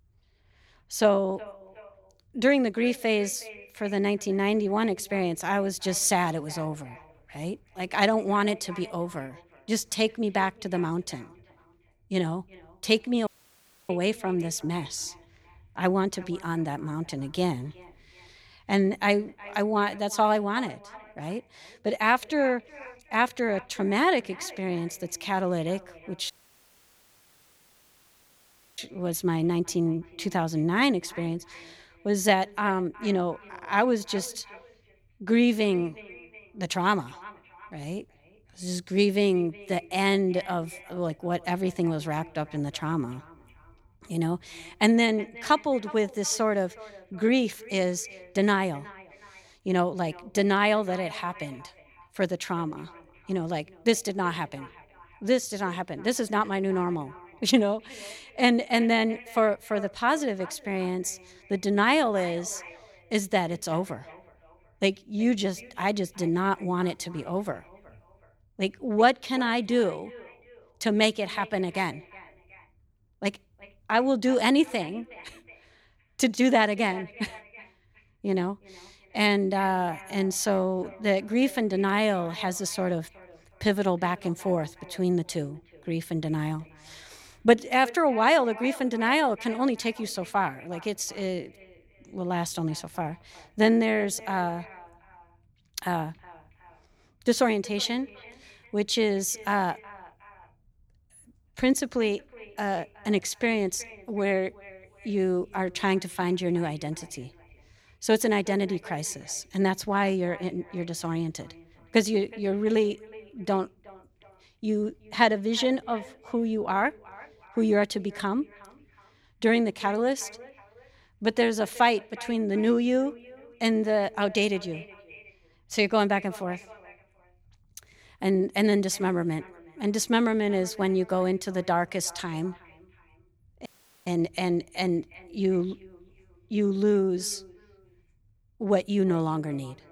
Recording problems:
echo of what is said; faint; throughout; 370 ms later, 20 dB below the speech
audio cutting out; at 13 s for 0.5 s, at 26 s for 2.5 s and at 2:14

